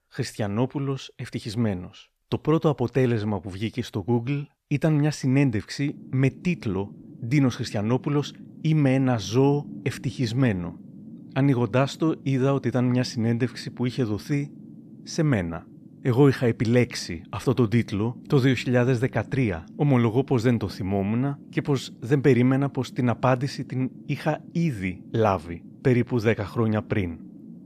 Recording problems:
low rumble; faint; from 6 s on; 20 dB below the speech

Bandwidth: 14.5 kHz